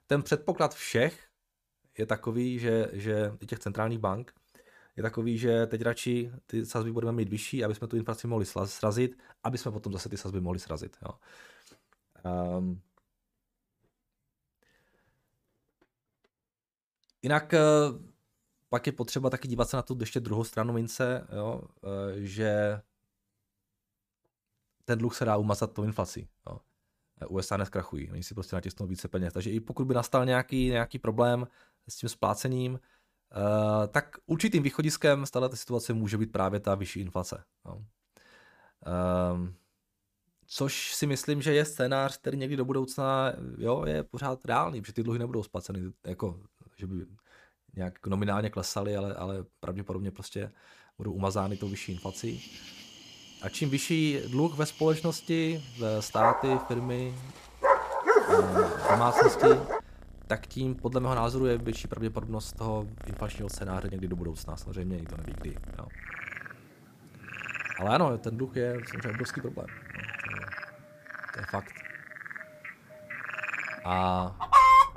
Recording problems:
animal sounds; very loud; from 52 s on; 4 dB above the speech

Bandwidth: 15 kHz